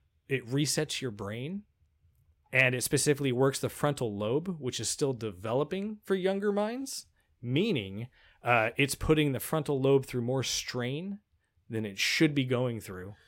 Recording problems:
none

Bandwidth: 16 kHz